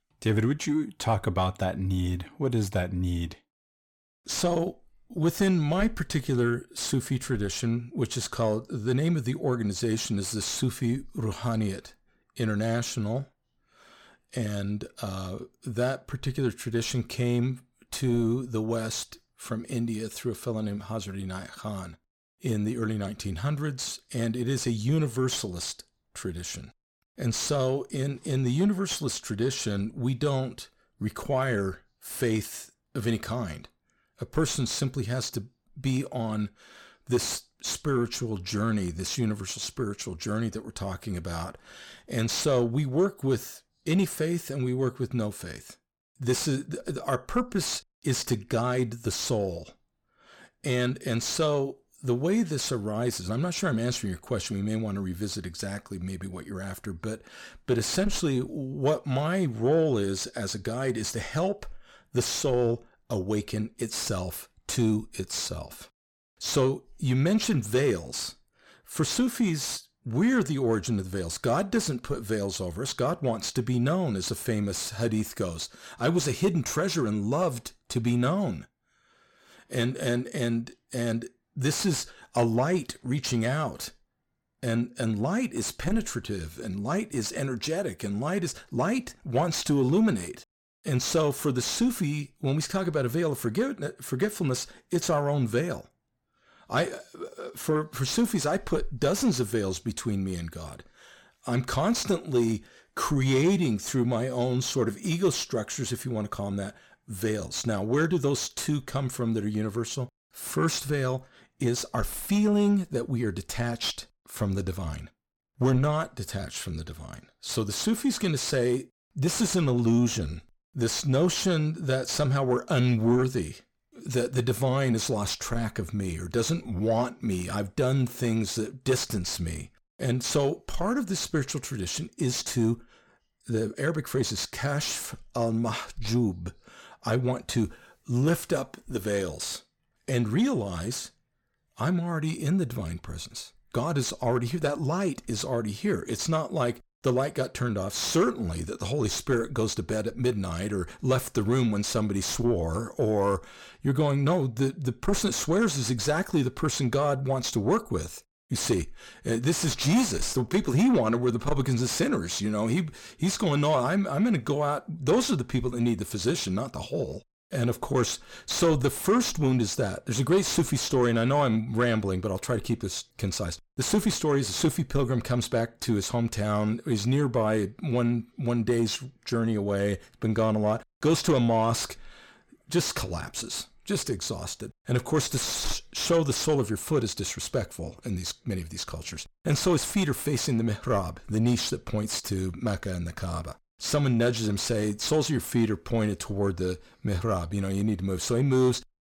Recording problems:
distortion; slight; 10 dB below the speech

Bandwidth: 17.5 kHz